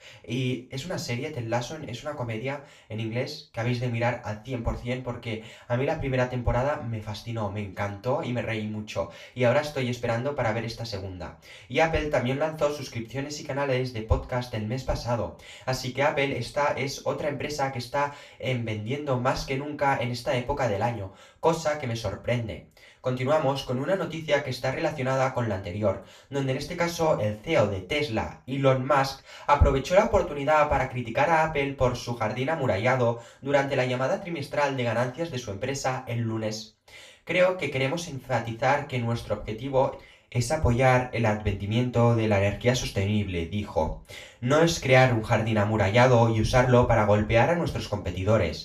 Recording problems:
off-mic speech; far
room echo; slight; dies away in 0.3 s

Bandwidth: 14.5 kHz